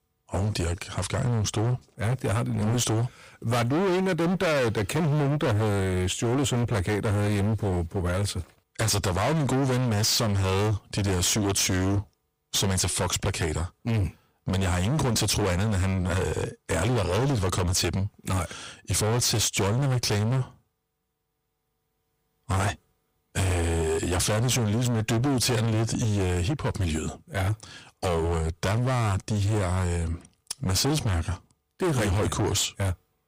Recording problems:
distortion; heavy; 29% of the sound clipped

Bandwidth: 15.5 kHz